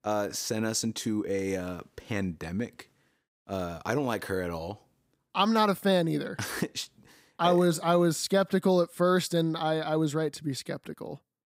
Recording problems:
none

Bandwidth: 15.5 kHz